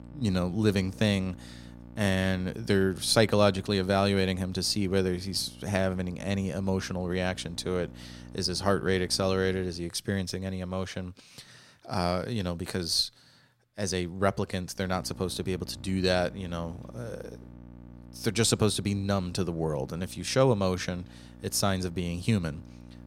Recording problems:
electrical hum; faint; until 10 s and from 15 s on; 60 Hz, 25 dB below the speech

